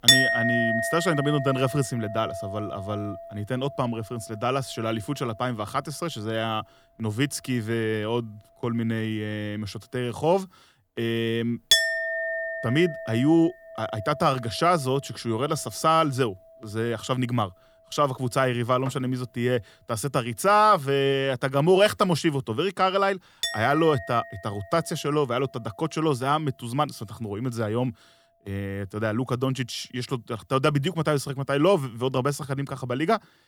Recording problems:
household noises; loud; throughout; 2 dB below the speech

